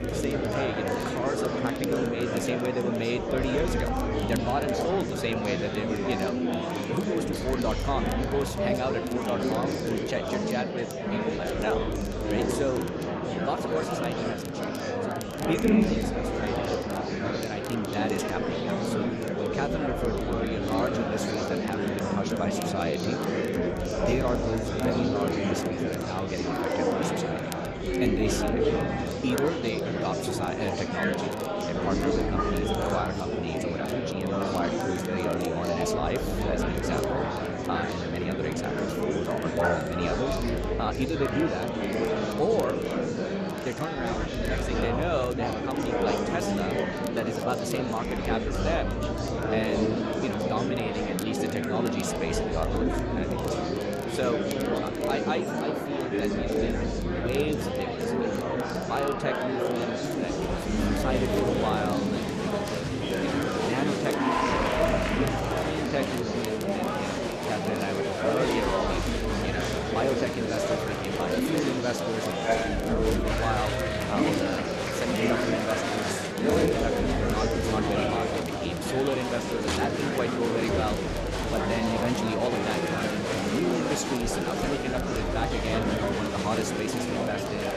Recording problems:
murmuring crowd; very loud; throughout; 4 dB above the speech
crackle, like an old record; noticeable; 15 dB below the speech
low rumble; faint; throughout; 25 dB below the speech

